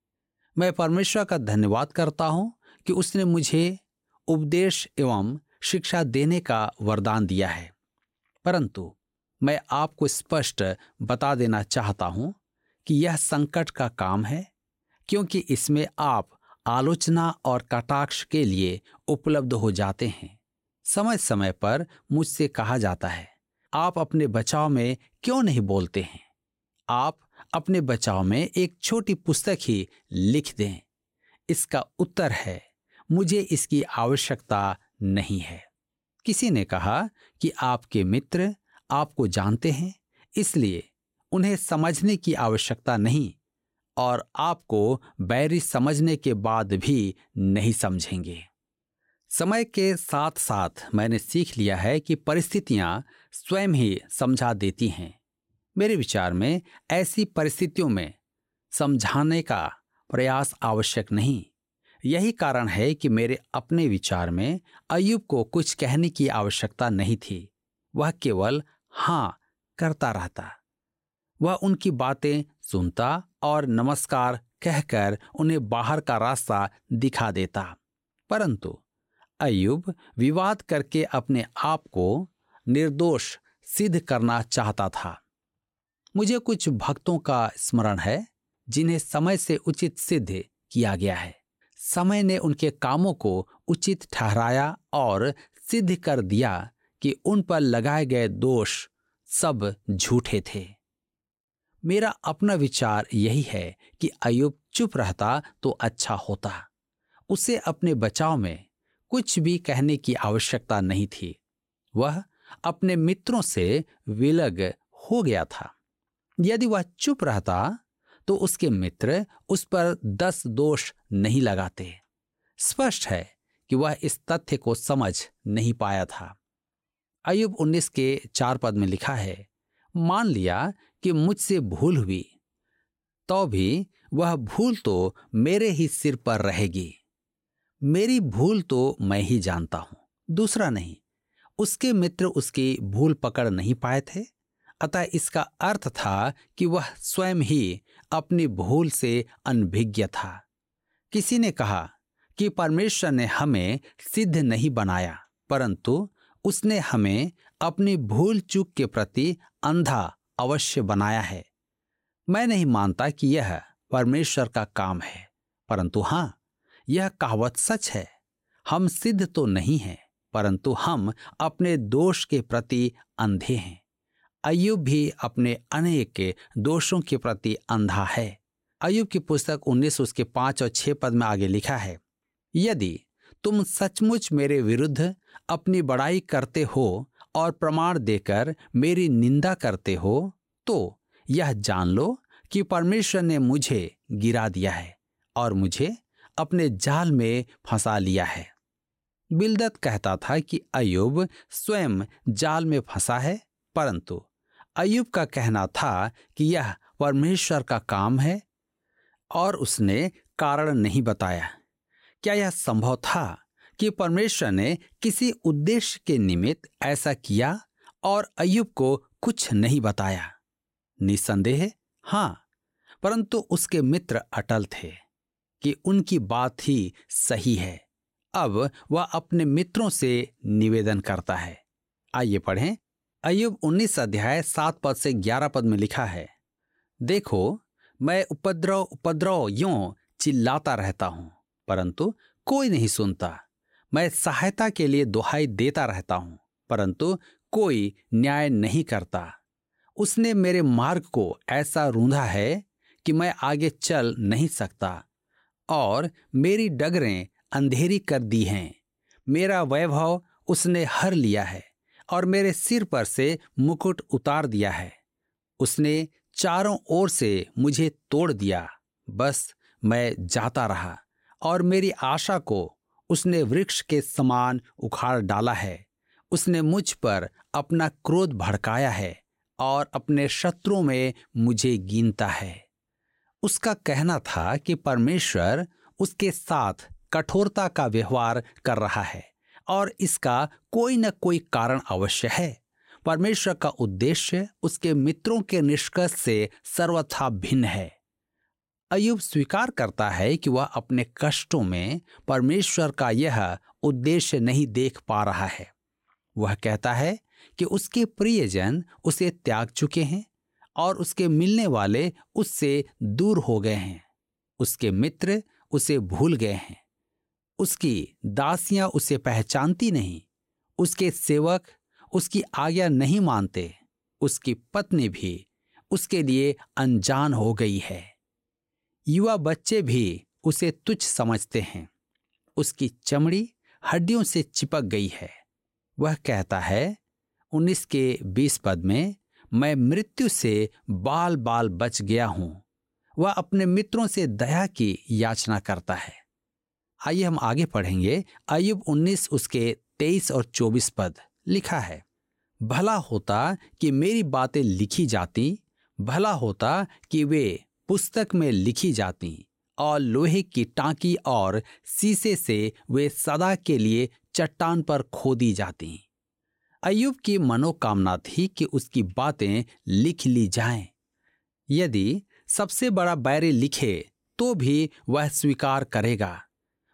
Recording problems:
none

